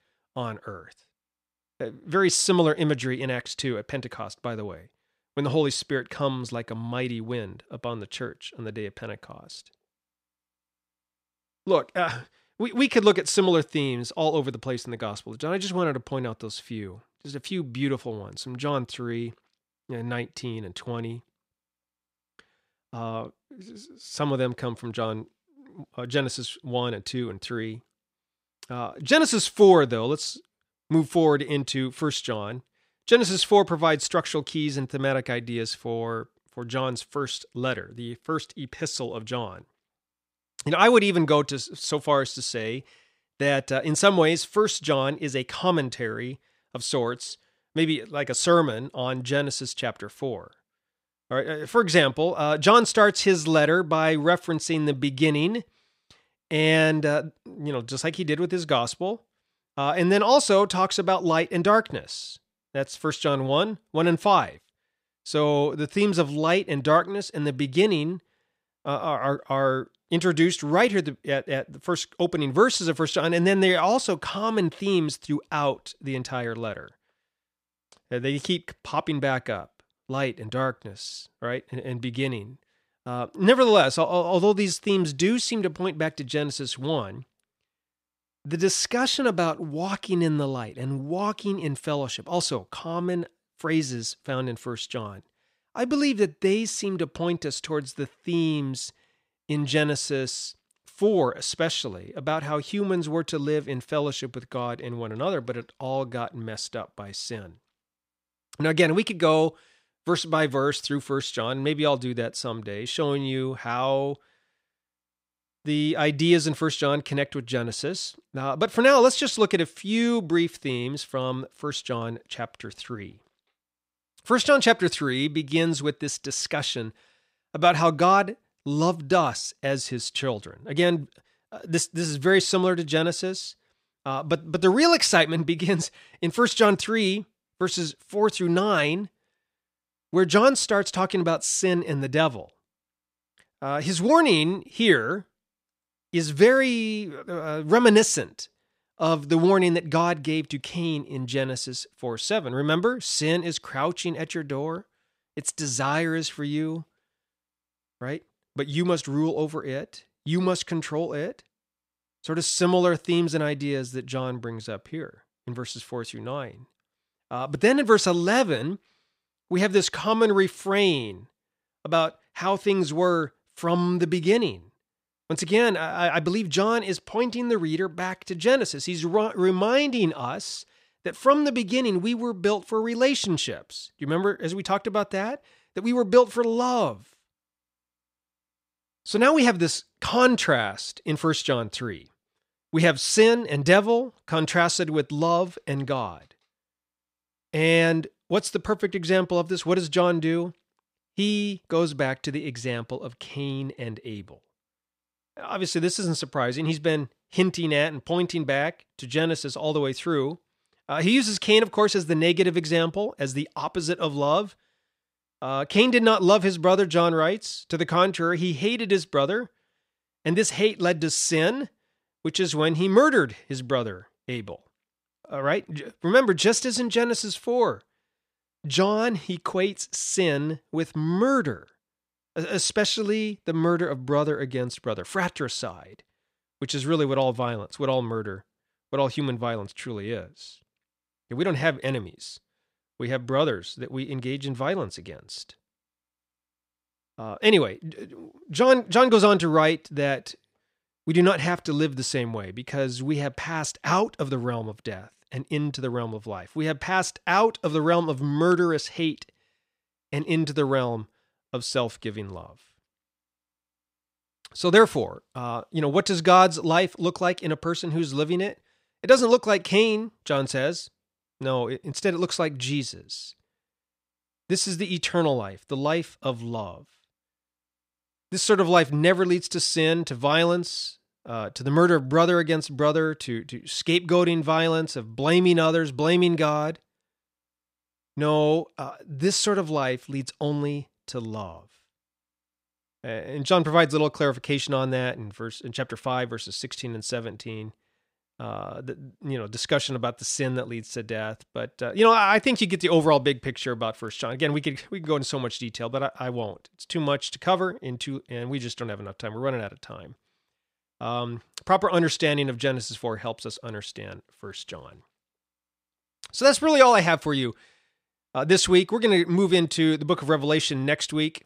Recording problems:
none

